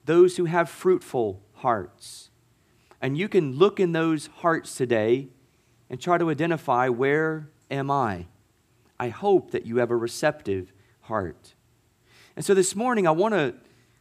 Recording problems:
none

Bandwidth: 15 kHz